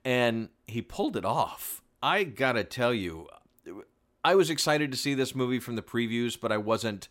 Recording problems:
none

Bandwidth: 16 kHz